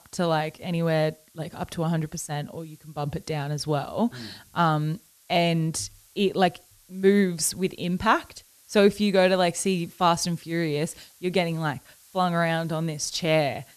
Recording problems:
hiss; faint; throughout; 30 dB below the speech

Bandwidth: 13.5 kHz